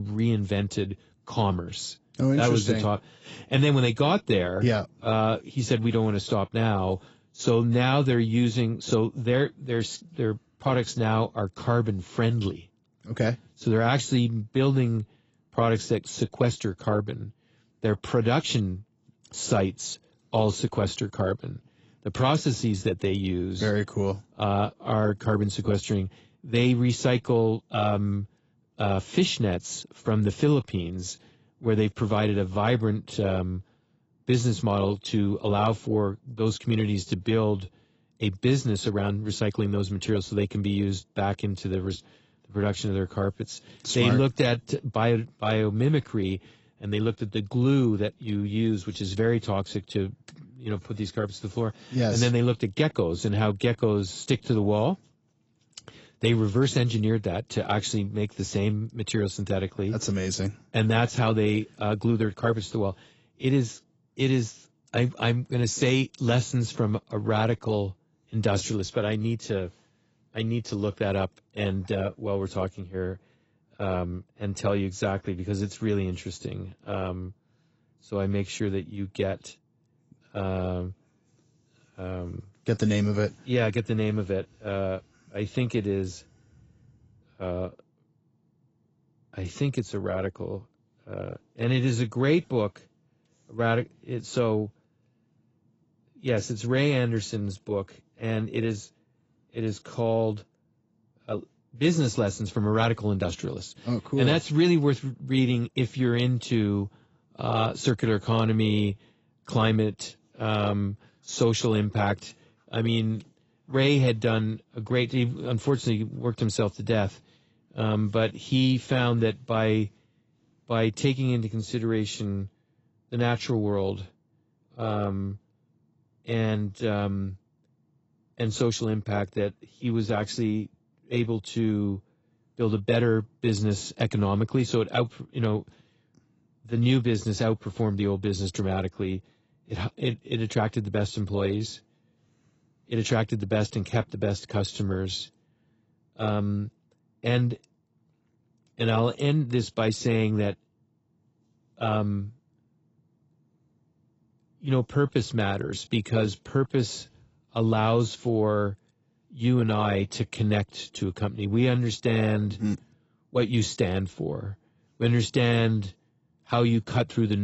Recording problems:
garbled, watery; badly; nothing above 8 kHz
abrupt cut into speech; at the start and the end

